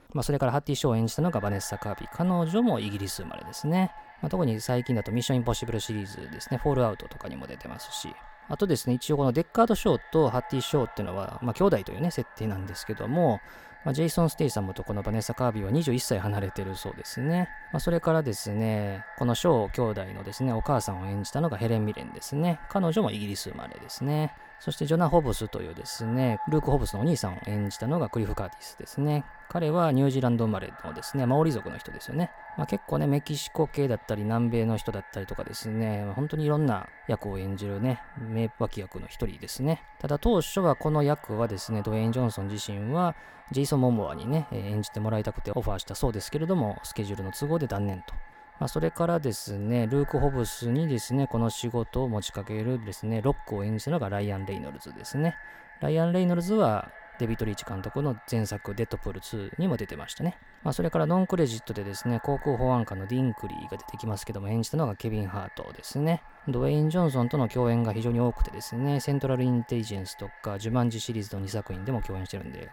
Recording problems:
echo of what is said; noticeable; throughout; 290 ms later, 20 dB below the speech

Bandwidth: 17 kHz